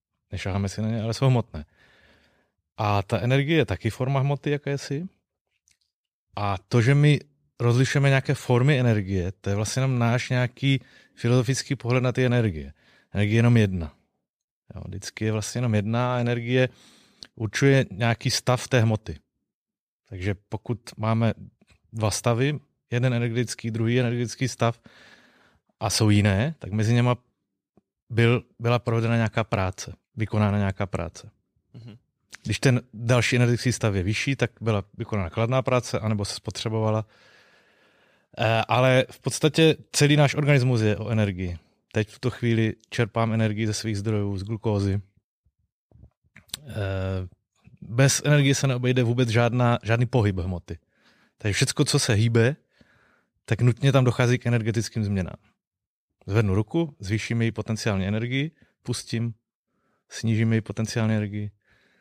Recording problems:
none

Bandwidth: 14.5 kHz